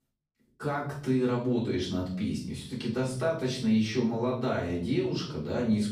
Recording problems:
off-mic speech; far
room echo; noticeable; dies away in 0.6 s

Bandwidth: 15.5 kHz